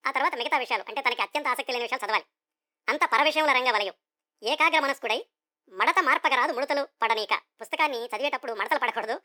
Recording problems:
wrong speed and pitch; too fast and too high; 1.5 times normal speed

